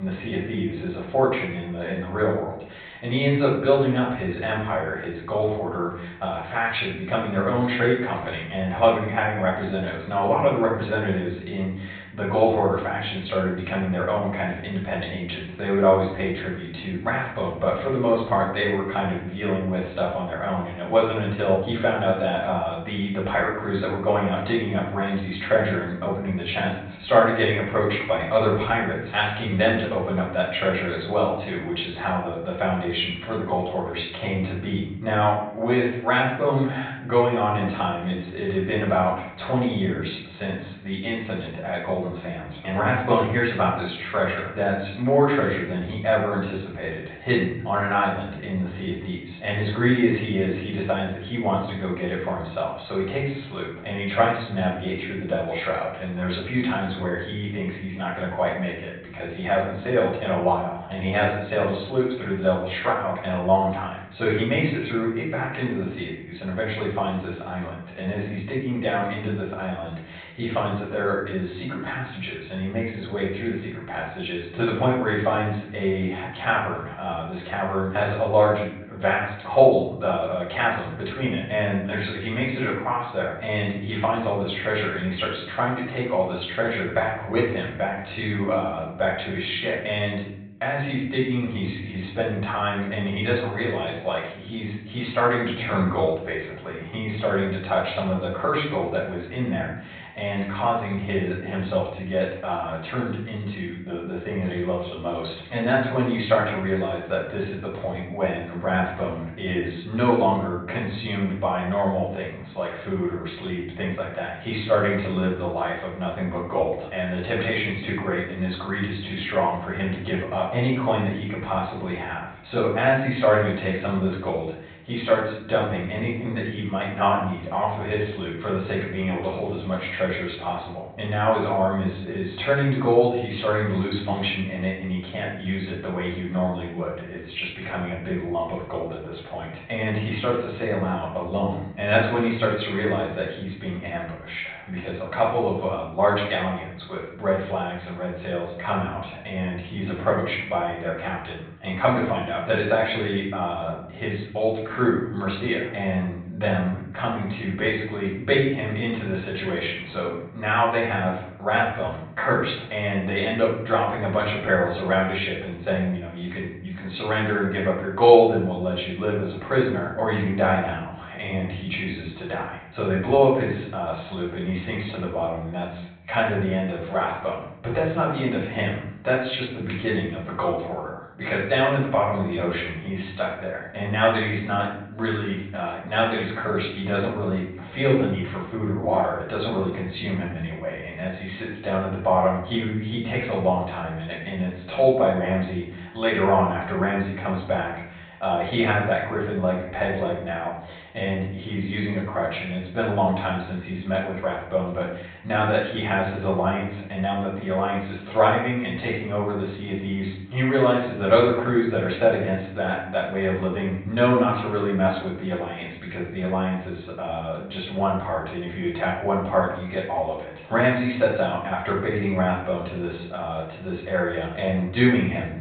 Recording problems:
off-mic speech; far
high frequencies cut off; severe; nothing above 4 kHz
room echo; noticeable; dies away in 0.7 s
abrupt cut into speech; at the start

